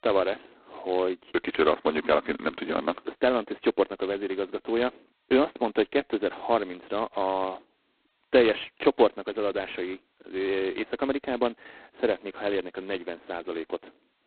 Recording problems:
phone-call audio; poor line; nothing above 4 kHz
muffled; very slightly; fading above 2.5 kHz

